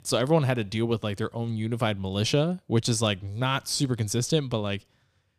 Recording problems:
none

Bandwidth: 15 kHz